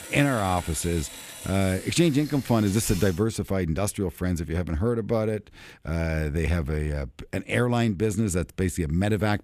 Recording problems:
machinery noise; noticeable; until 3 s; 15 dB below the speech

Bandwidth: 14.5 kHz